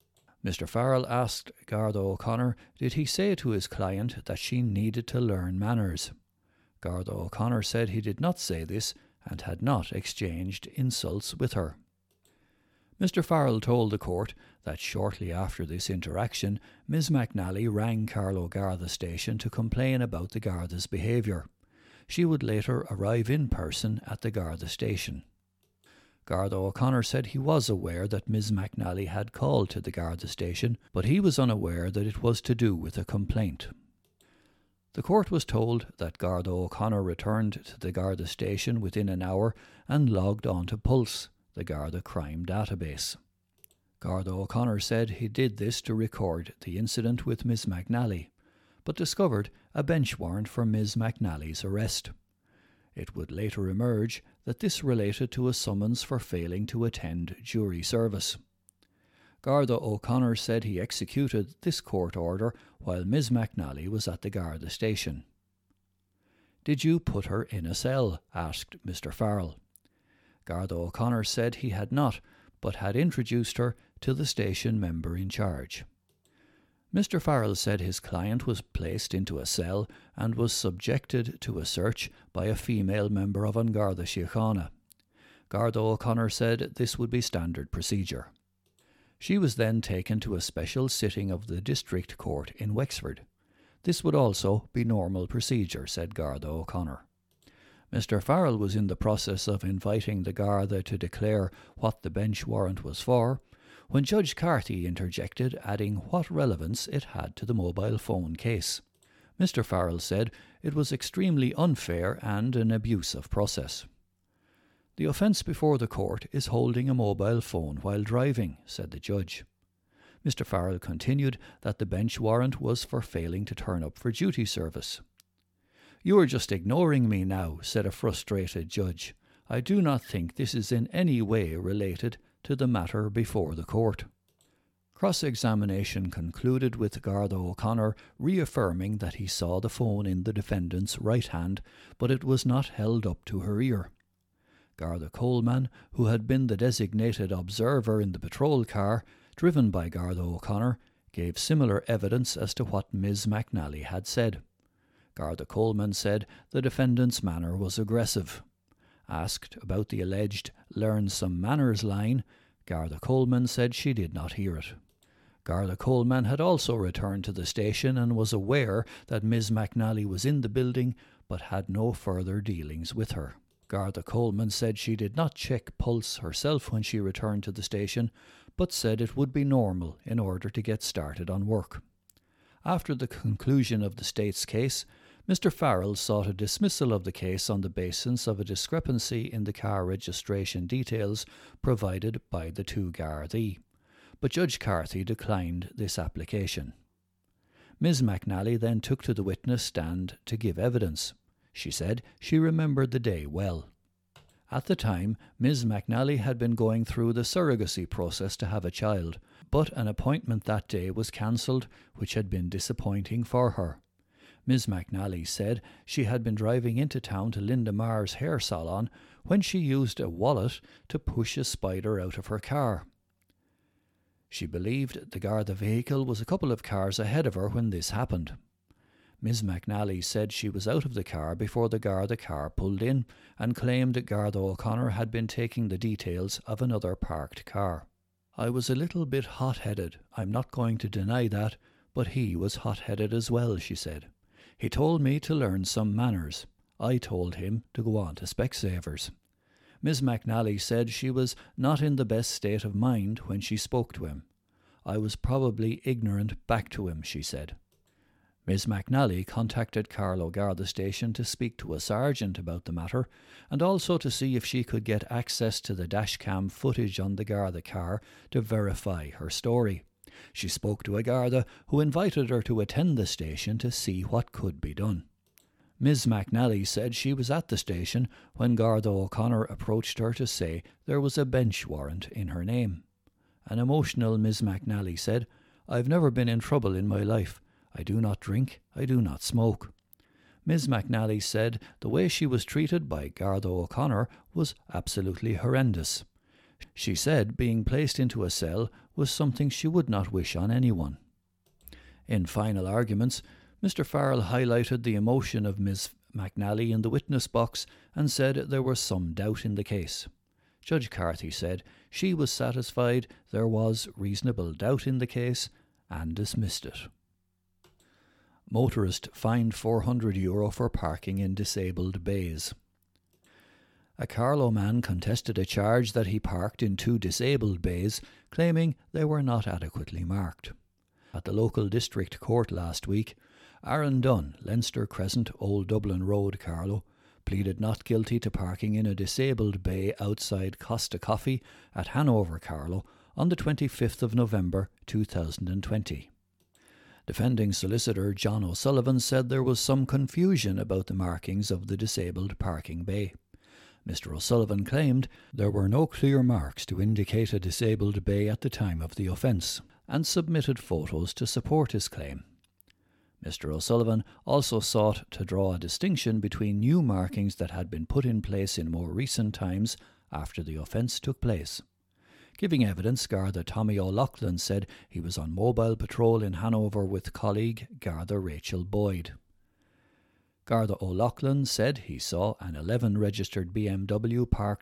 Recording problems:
none

